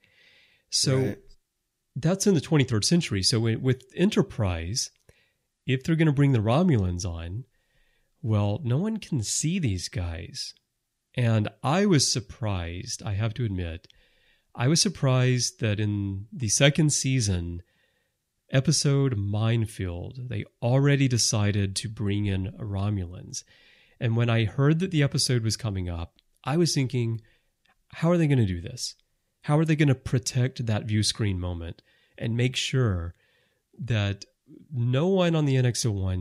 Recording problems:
abrupt cut into speech; at the end

